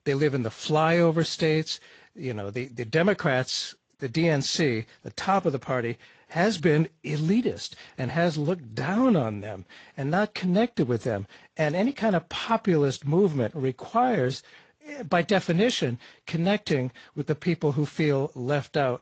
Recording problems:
garbled, watery; slightly; nothing above 7.5 kHz

